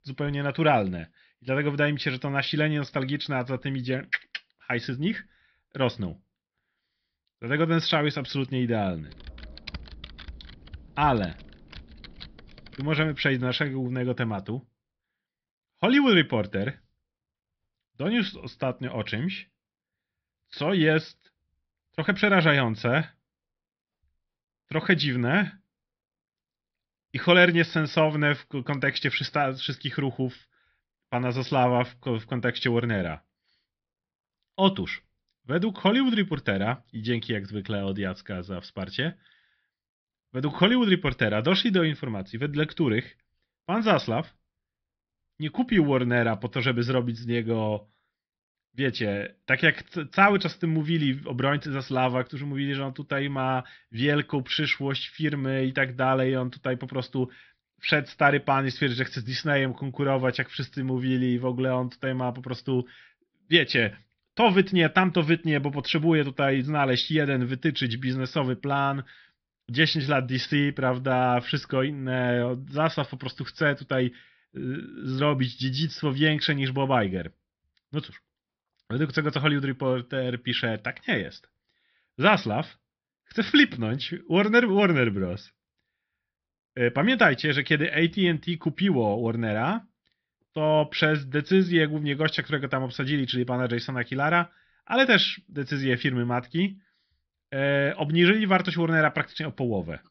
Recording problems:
high frequencies cut off; noticeable; nothing above 5.5 kHz
keyboard typing; faint; from 9 to 13 s; peak 15 dB below the speech

